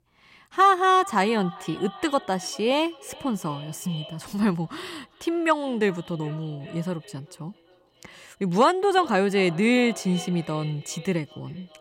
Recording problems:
echo of what is said; noticeable; throughout; 390 ms later, 20 dB below the speech

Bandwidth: 16 kHz